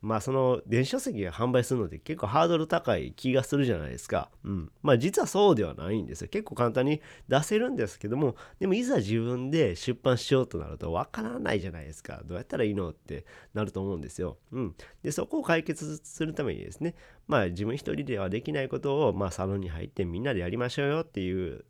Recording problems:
none

